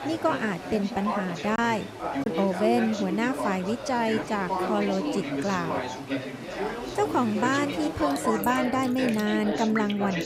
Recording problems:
chatter from many people; loud; throughout; 4 dB below the speech
rain or running water; noticeable; throughout; 15 dB below the speech
choppy; very; at 1.5 s; 5% of the speech affected

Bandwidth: 15.5 kHz